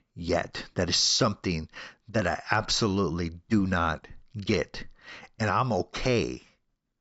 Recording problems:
high frequencies cut off; noticeable; nothing above 8 kHz

